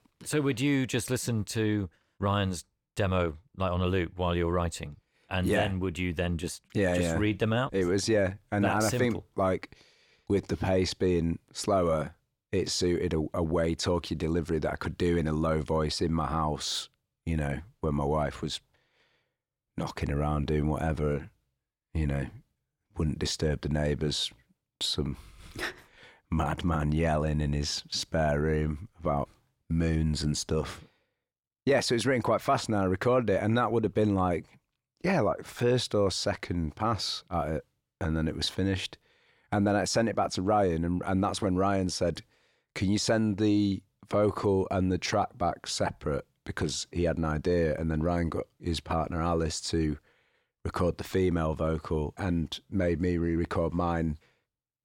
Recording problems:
none

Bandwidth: 17 kHz